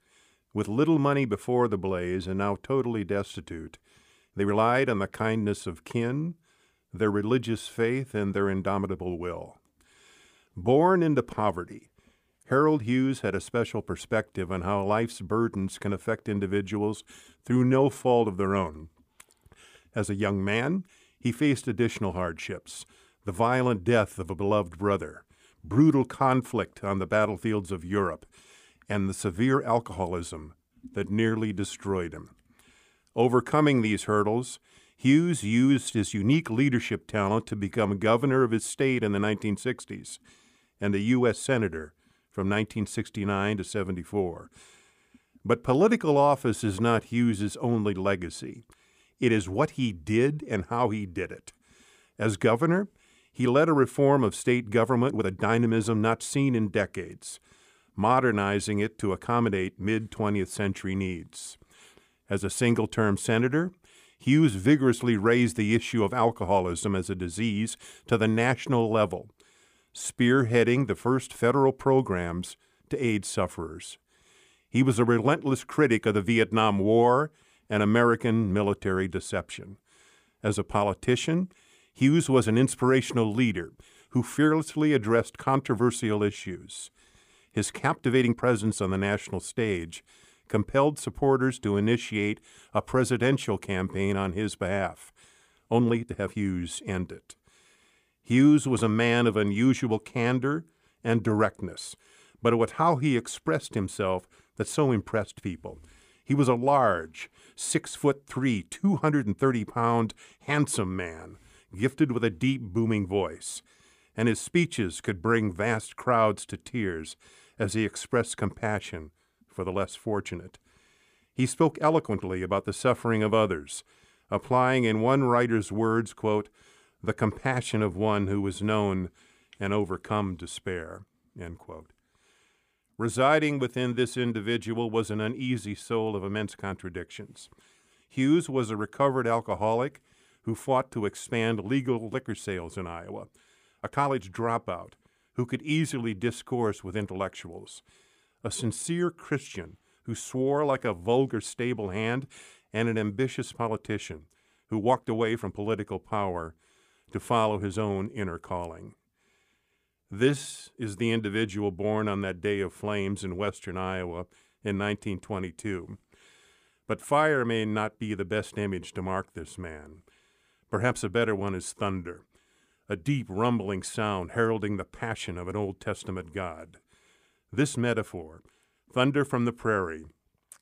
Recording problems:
uneven, jittery; strongly; from 4.5 s to 2:41

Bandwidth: 15 kHz